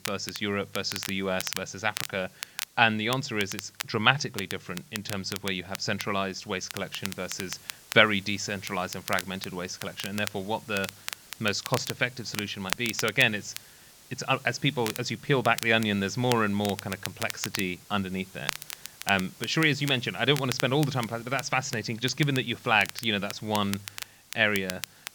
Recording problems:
high frequencies cut off; noticeable; nothing above 8 kHz
crackle, like an old record; noticeable; 10 dB below the speech
hiss; faint; throughout; 25 dB below the speech

